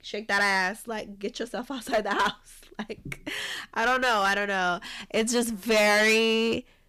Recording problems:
distortion; heavy; 8% of the sound clipped

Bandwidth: 15 kHz